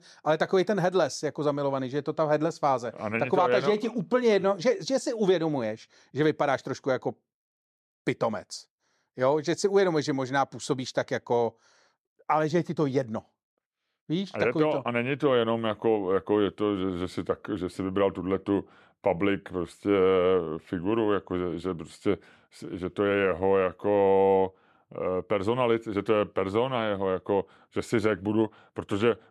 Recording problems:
none

